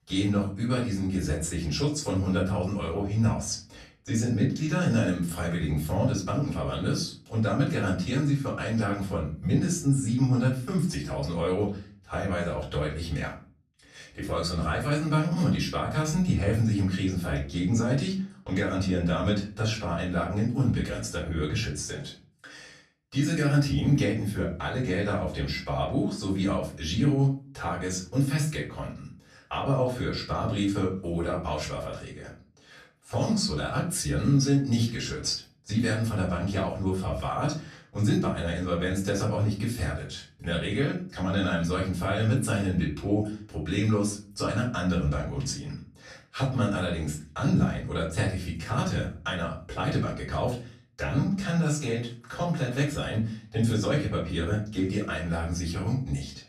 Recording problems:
off-mic speech; far
room echo; slight; dies away in 0.4 s

